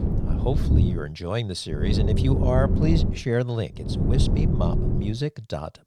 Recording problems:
low rumble; loud; at the start, from 2 to 3 s and from 4 to 5 s; 3 dB below the speech

